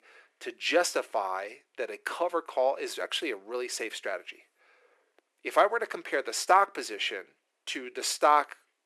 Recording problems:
thin; very; fading below 350 Hz

